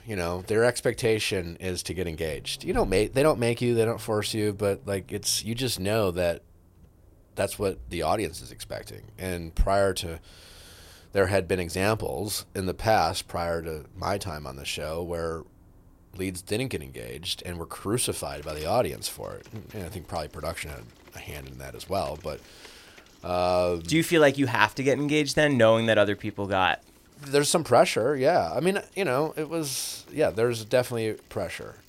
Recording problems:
traffic noise; faint; throughout; 25 dB below the speech

